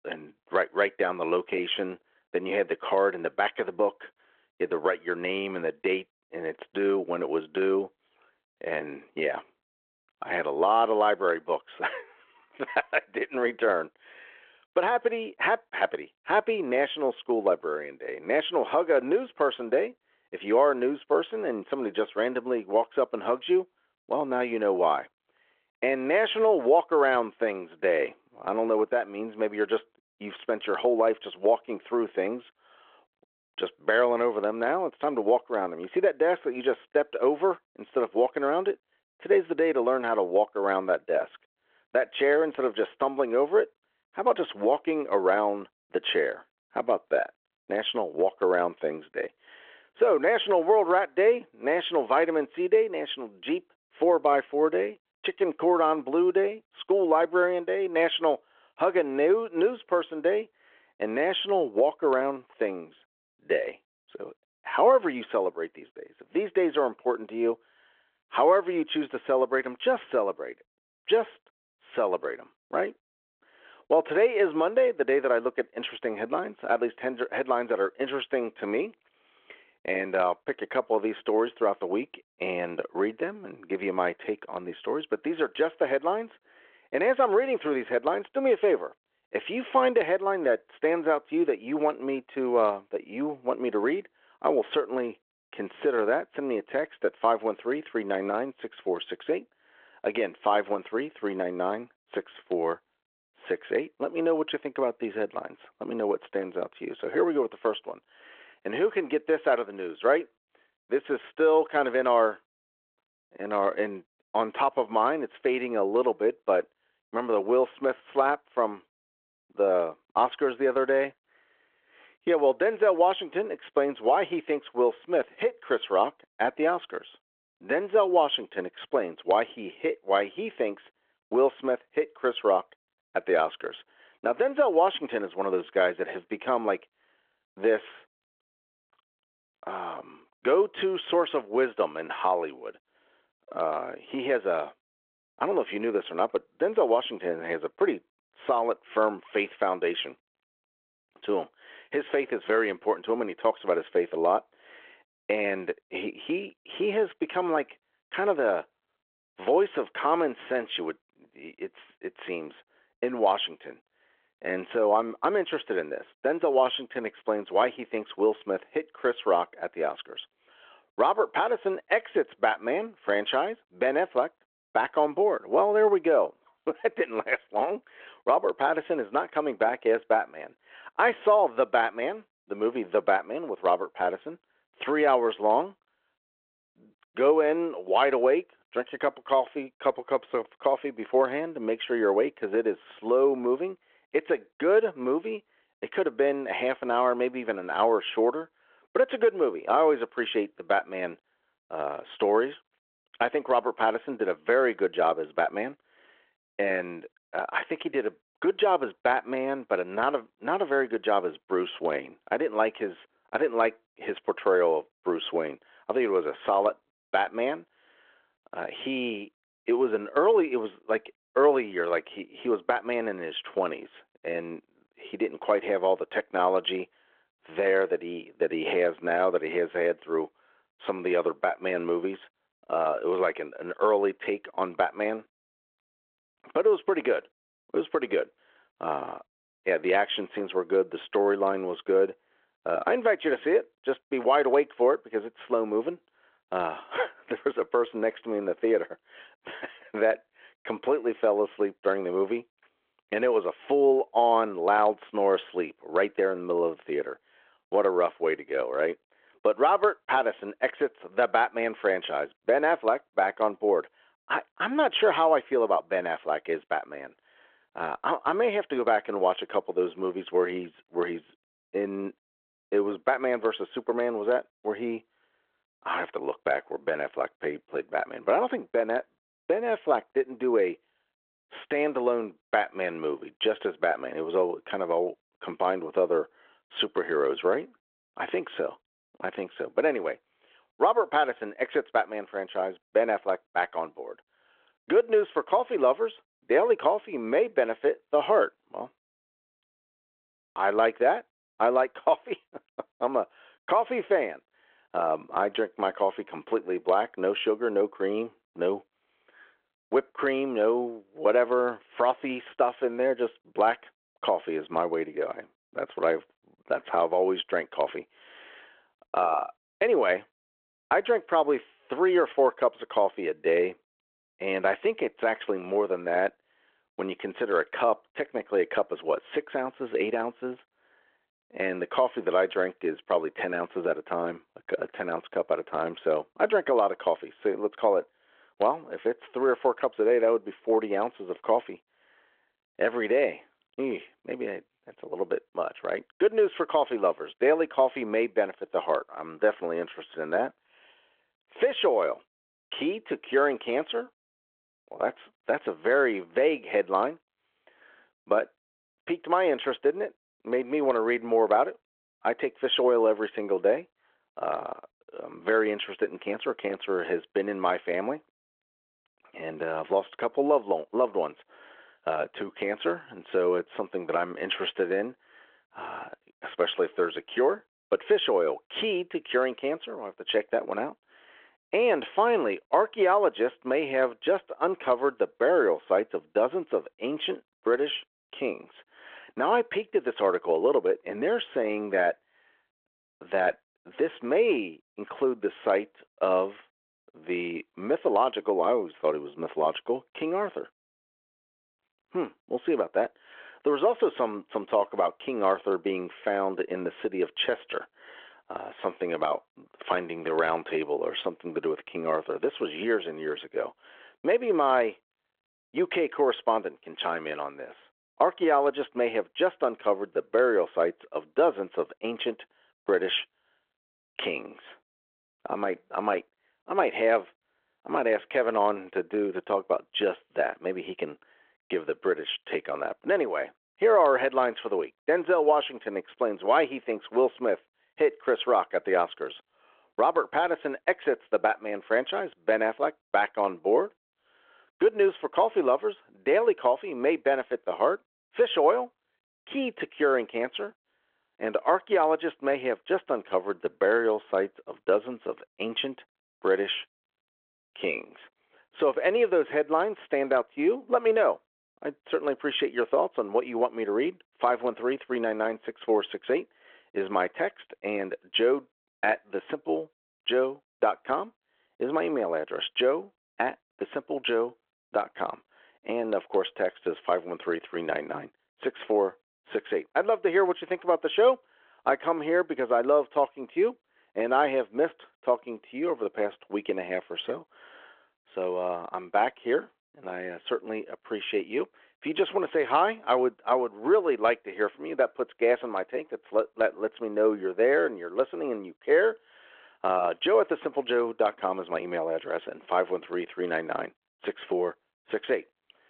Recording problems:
phone-call audio

